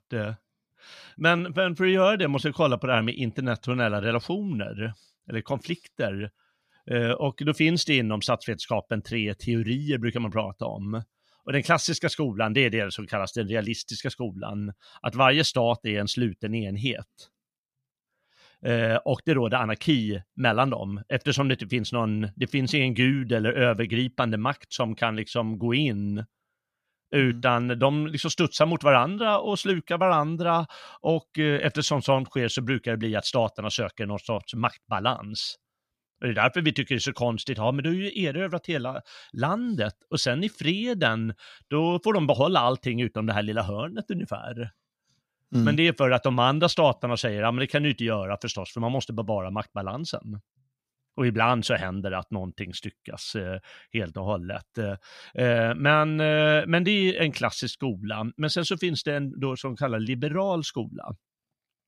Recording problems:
none

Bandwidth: 15 kHz